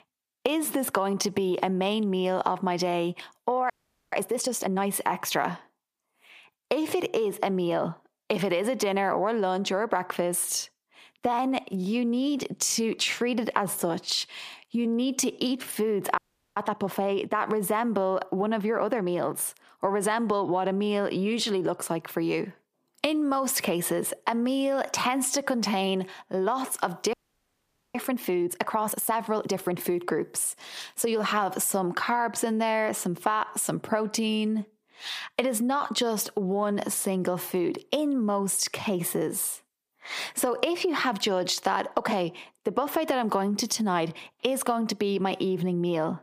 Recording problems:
squashed, flat; heavily
audio freezing; at 3.5 s, at 16 s and at 27 s for 1 s

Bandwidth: 15 kHz